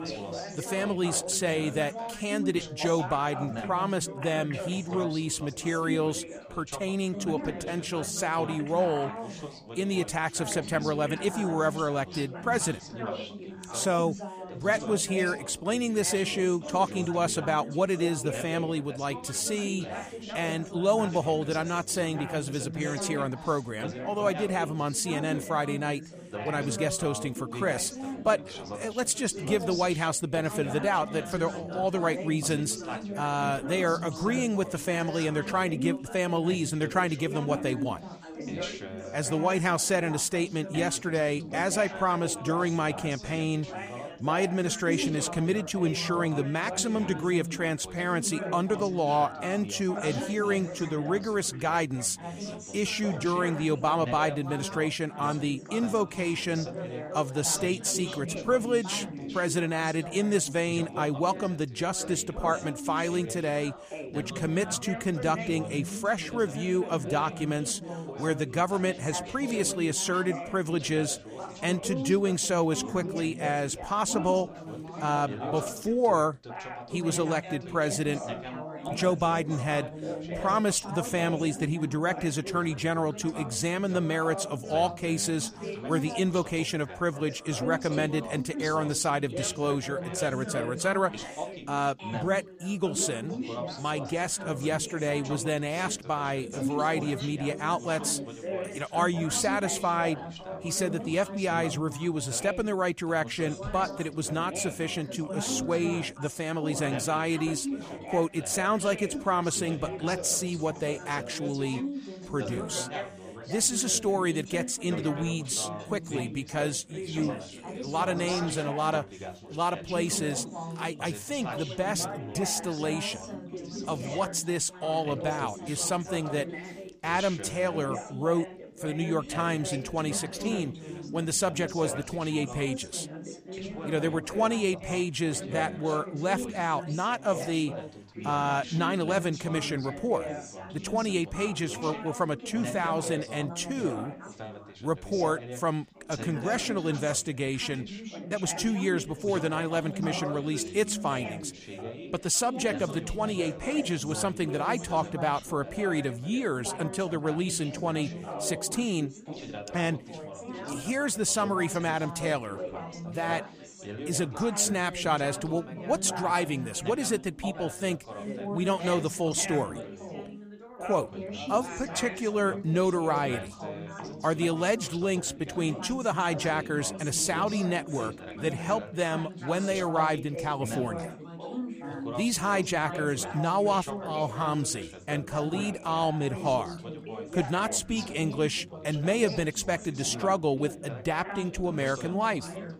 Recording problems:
background chatter; loud; throughout; 4 voices, 9 dB below the speech

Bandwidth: 15 kHz